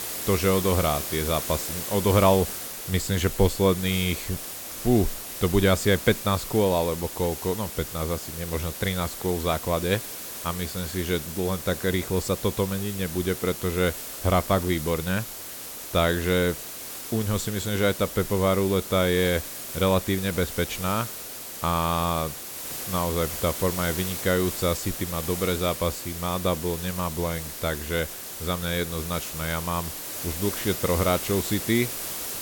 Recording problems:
hiss; loud; throughout; 7 dB below the speech

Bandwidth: 17.5 kHz